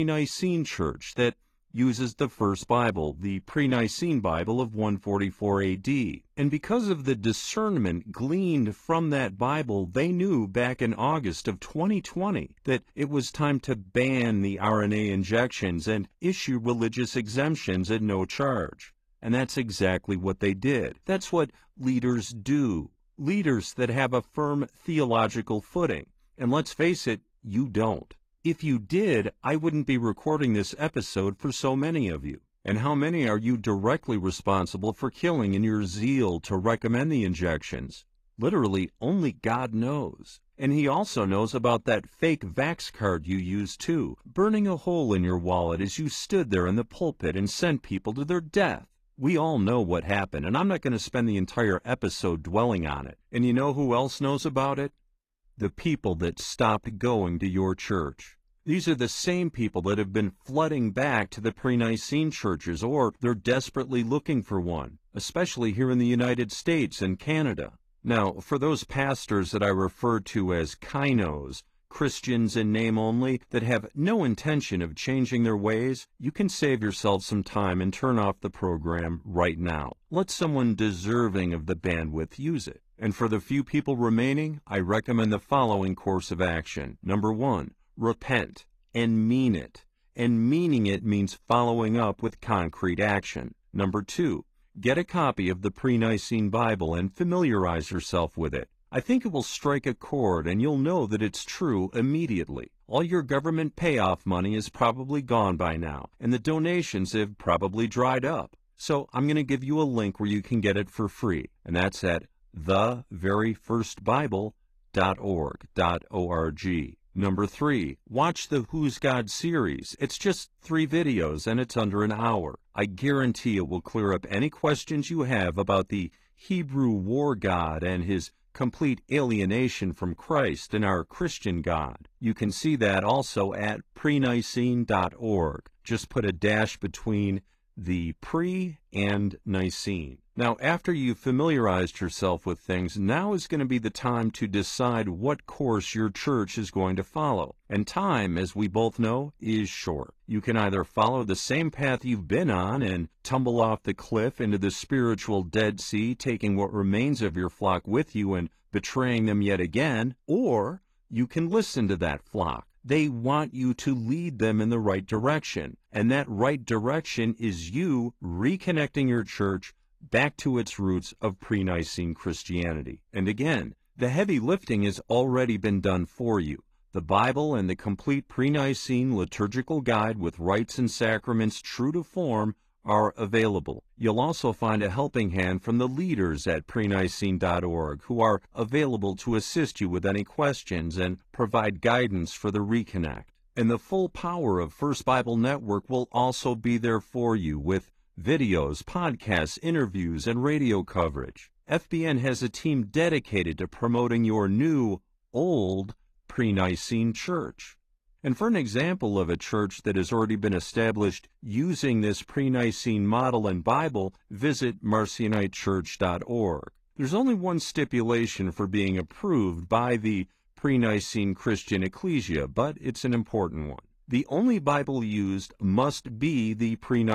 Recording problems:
garbled, watery; slightly
abrupt cut into speech; at the start and the end

